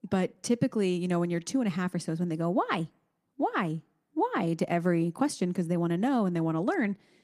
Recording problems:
garbled, watery; slightly; nothing above 15 kHz

